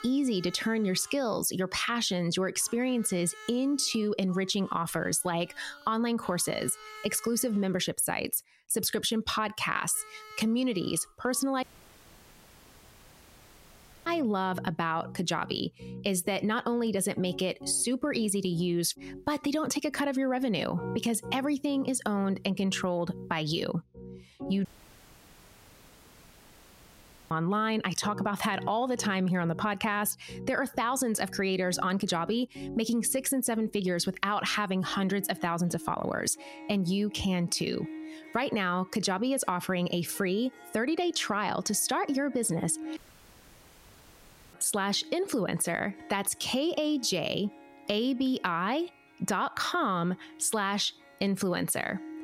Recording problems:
squashed, flat; heavily, background pumping
background music; noticeable; throughout; 20 dB below the speech
audio cutting out; at 12 s for 2.5 s, at 25 s for 2.5 s and at 43 s for 1.5 s

